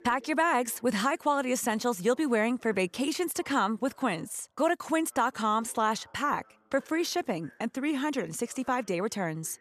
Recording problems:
voice in the background; faint; throughout; 30 dB below the speech

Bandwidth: 14 kHz